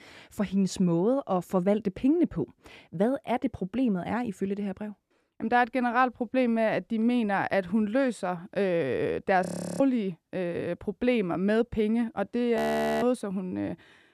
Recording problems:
audio freezing; at 9.5 s and at 13 s

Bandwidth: 14.5 kHz